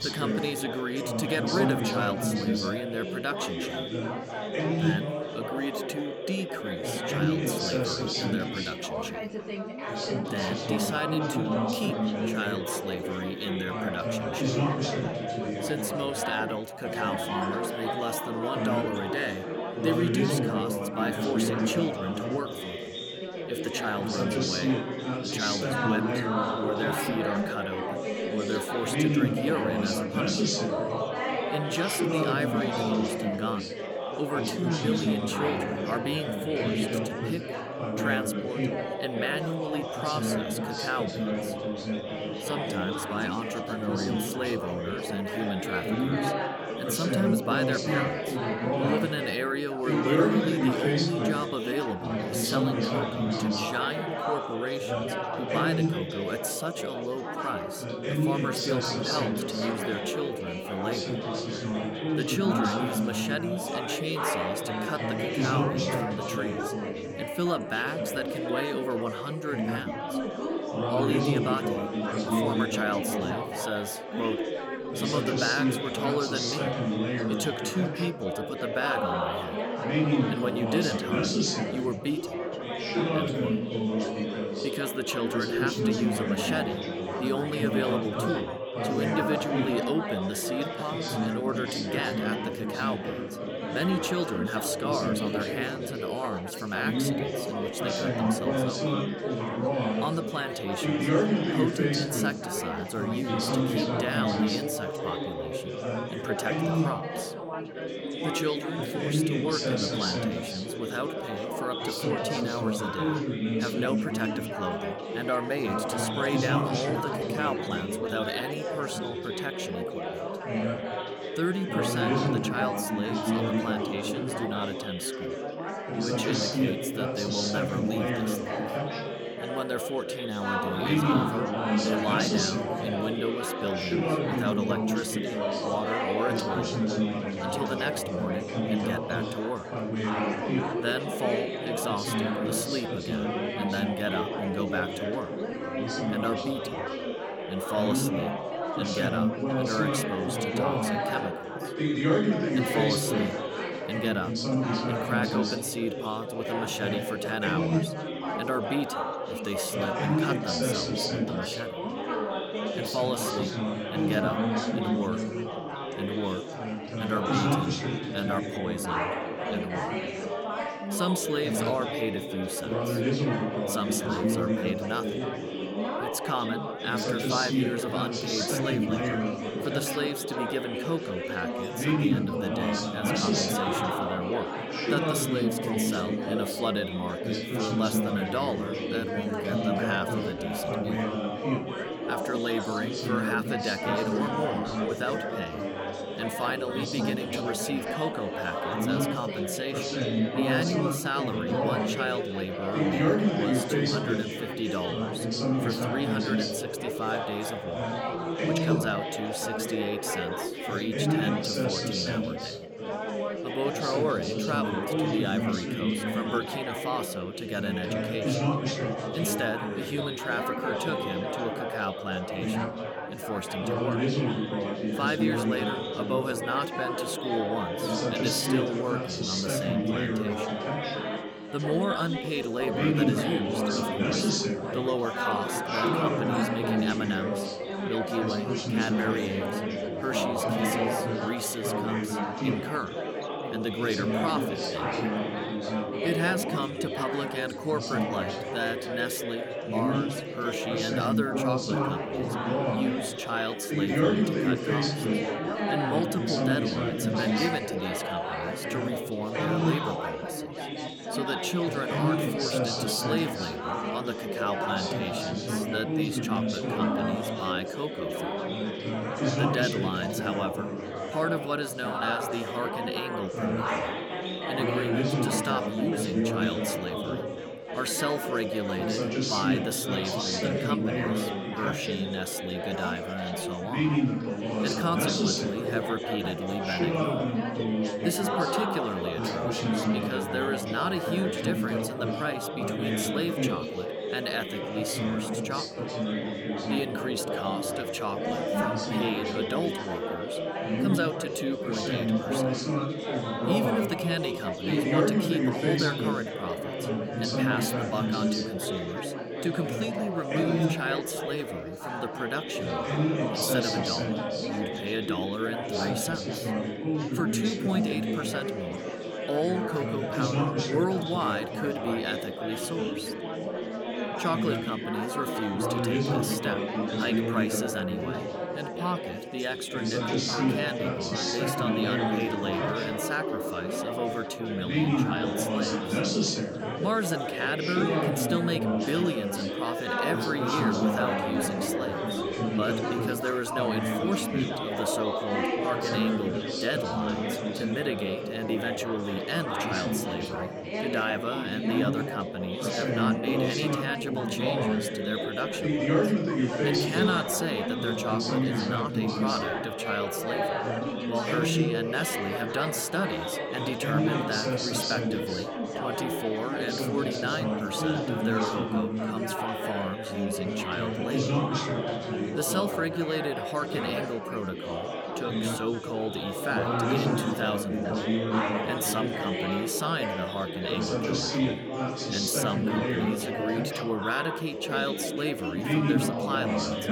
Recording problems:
chatter from many people; very loud; throughout; 3 dB above the speech

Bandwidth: 18.5 kHz